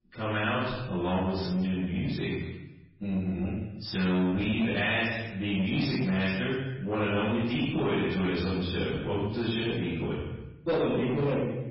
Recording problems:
room echo; strong; dies away in 0.9 s
off-mic speech; far
garbled, watery; badly; nothing above 5.5 kHz
distortion; slight; 10 dB below the speech

